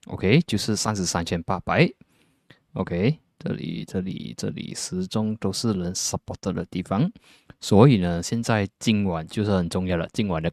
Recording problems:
none

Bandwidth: 13.5 kHz